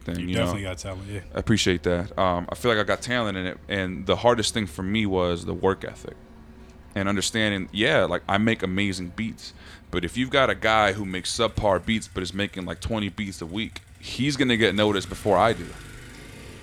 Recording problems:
traffic noise; faint; throughout; 20 dB below the speech

